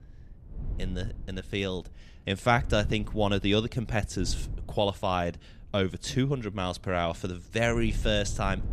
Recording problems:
wind noise on the microphone; occasional gusts; 25 dB below the speech

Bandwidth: 14 kHz